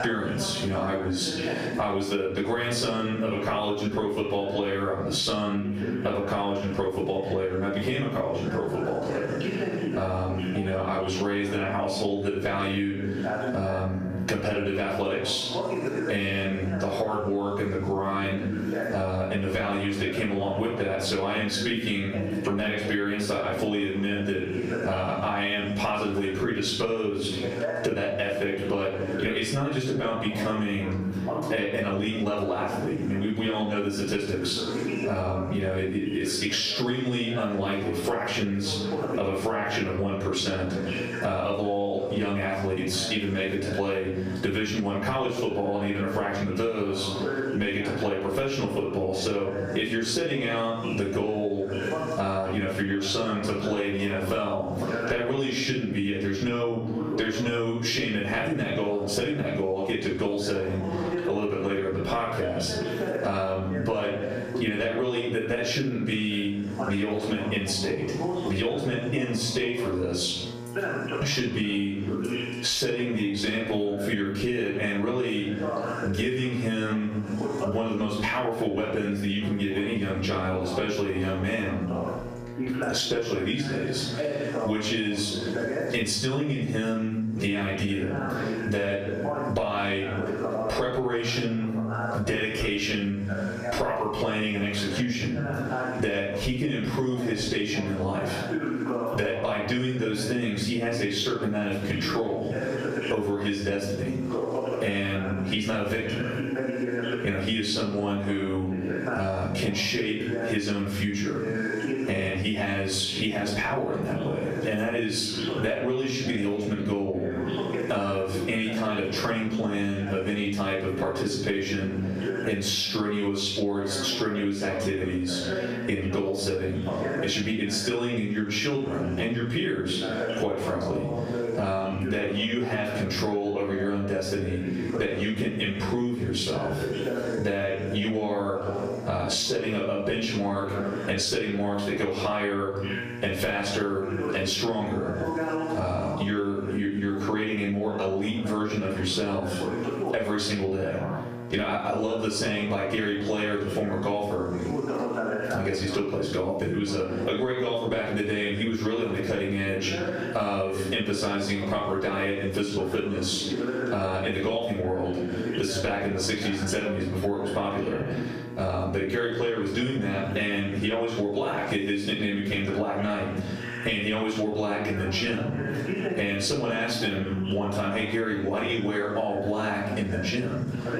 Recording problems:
off-mic speech; far
room echo; noticeable; dies away in 0.5 s
squashed, flat; somewhat, background pumping
voice in the background; loud; throughout; 8 dB below the speech
electrical hum; faint; throughout; 60 Hz, 20 dB below the speech

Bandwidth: 14.5 kHz